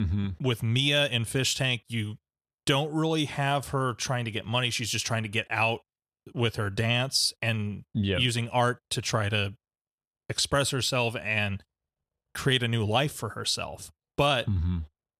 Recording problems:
abrupt cut into speech; at the start

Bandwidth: 14 kHz